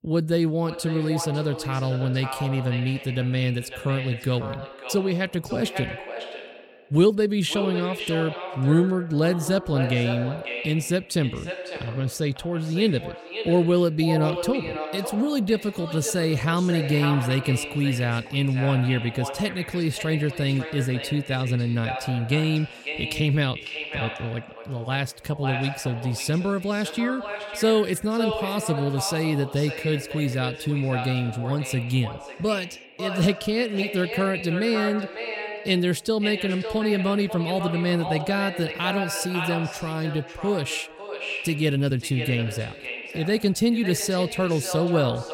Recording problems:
echo of what is said; strong; throughout; 550 ms later, 9 dB below the speech

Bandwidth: 16.5 kHz